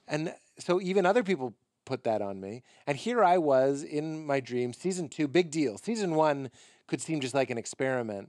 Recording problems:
none

